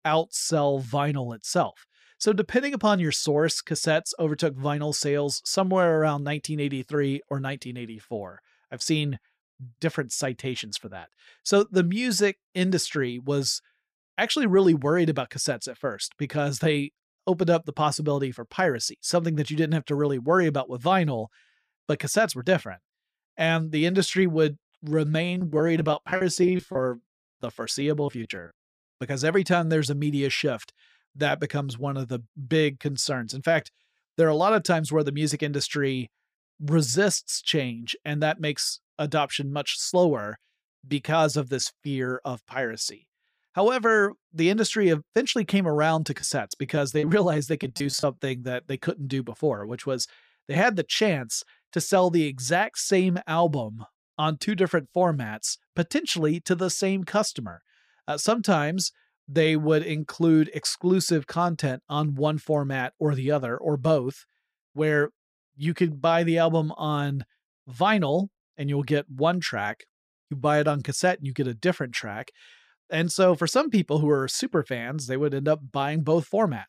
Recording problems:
choppy; very; from 25 to 28 s and from 46 to 48 s; 16% of the speech affected

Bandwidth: 15 kHz